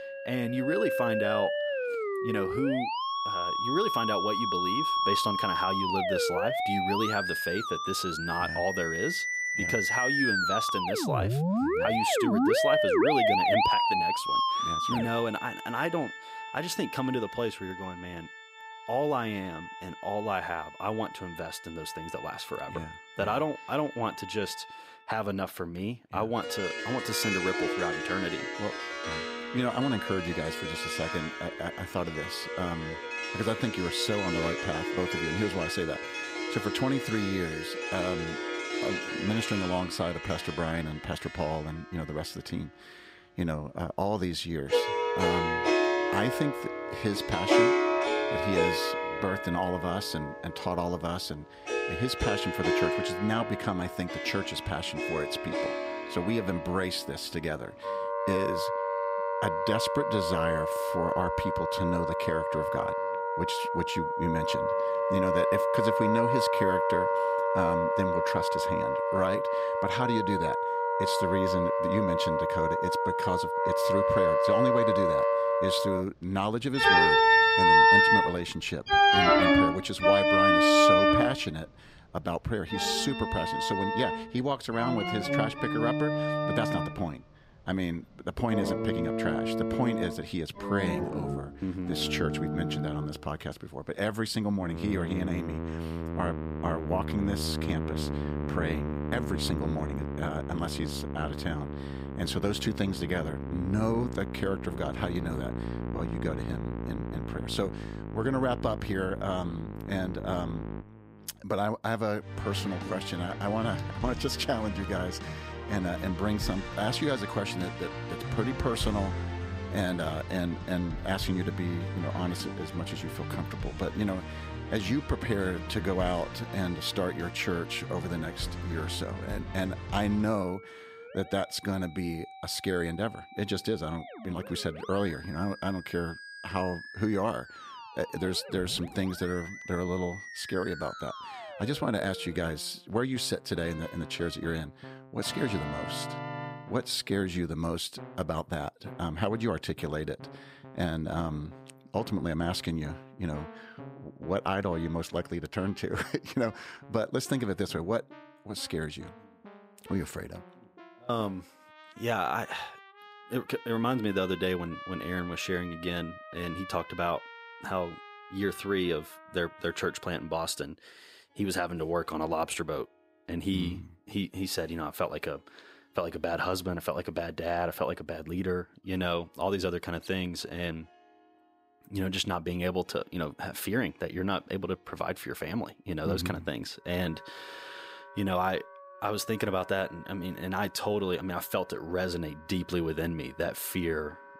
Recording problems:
background music; very loud; throughout; 3 dB above the speech

